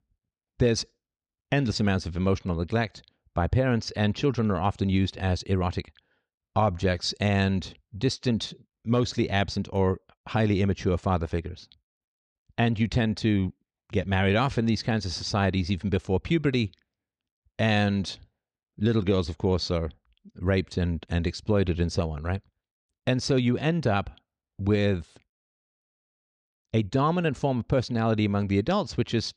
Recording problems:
none

